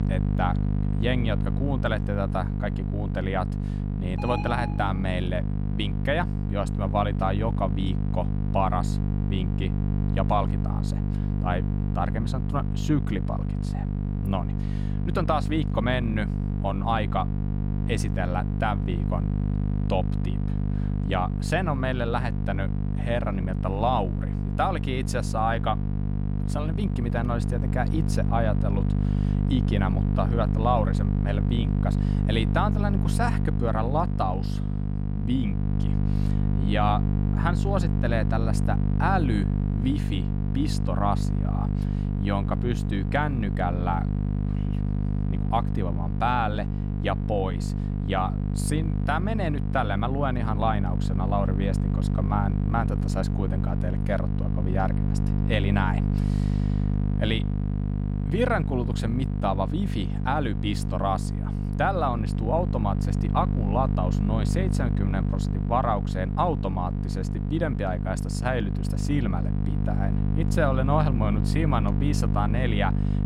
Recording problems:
electrical hum; loud; throughout; 50 Hz, 8 dB below the speech
alarm; noticeable; at 4 s; peak 4 dB below the speech

